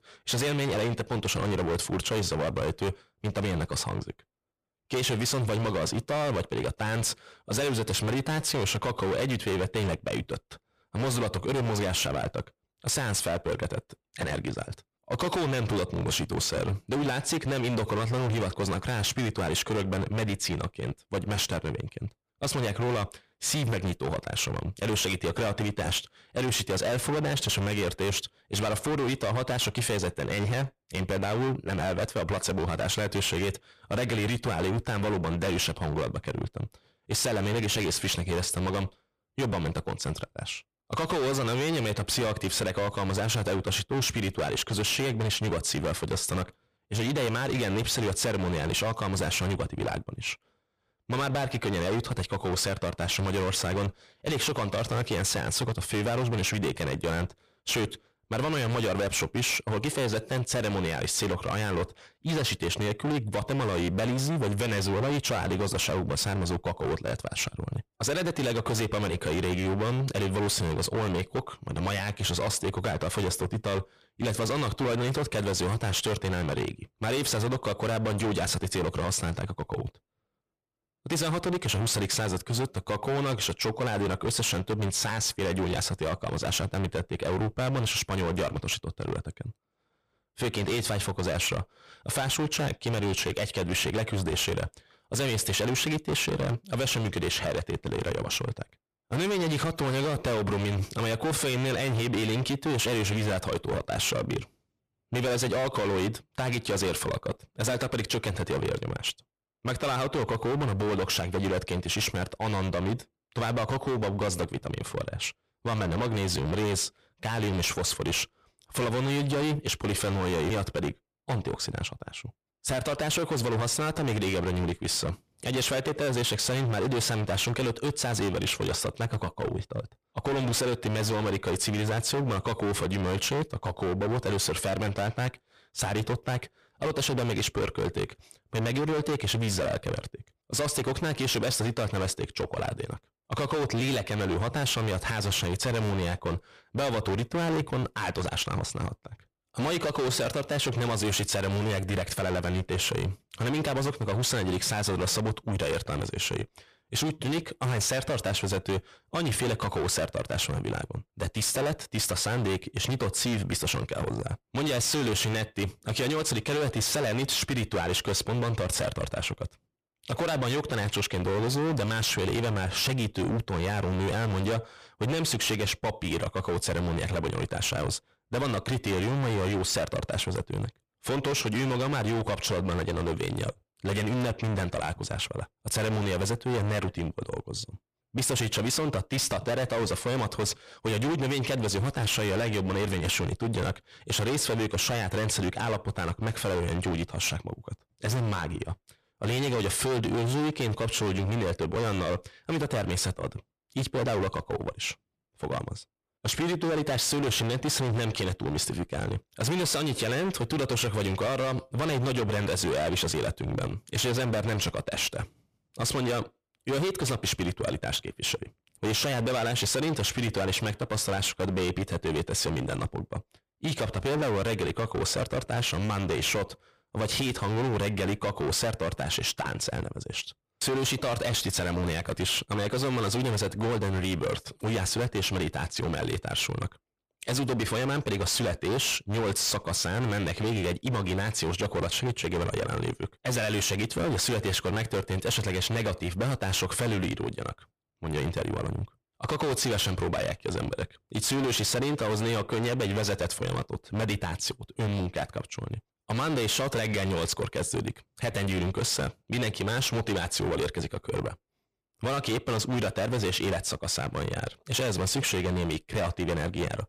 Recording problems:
distortion; heavy; 27% of the sound clipped

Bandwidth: 15 kHz